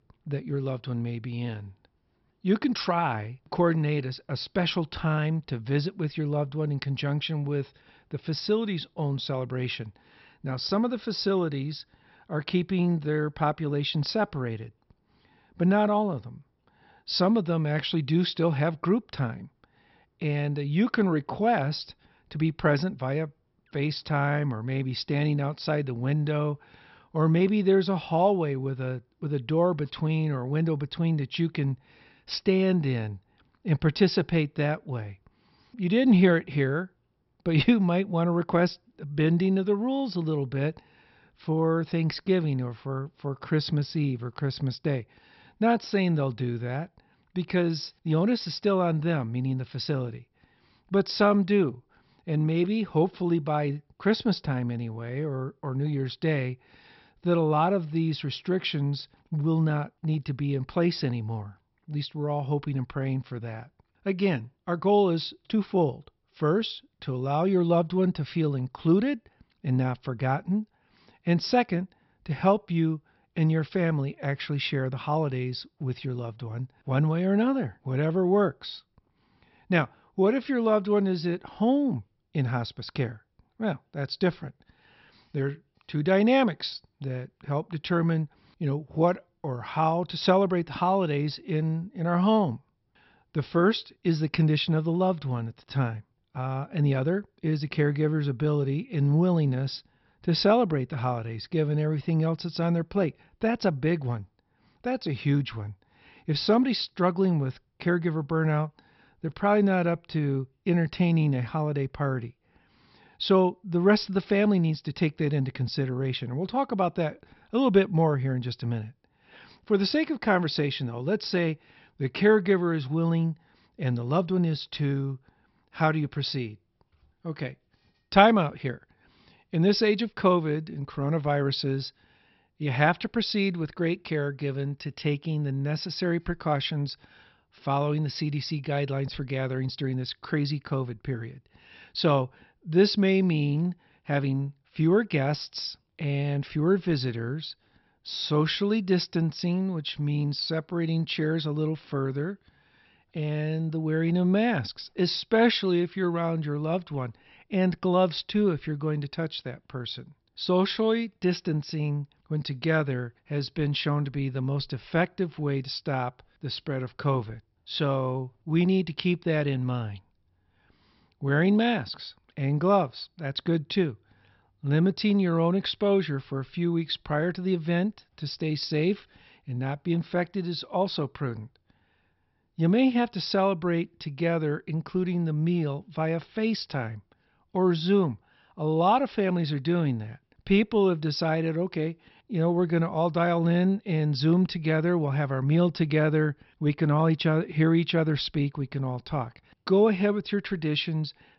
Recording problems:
high frequencies cut off; noticeable; nothing above 5.5 kHz

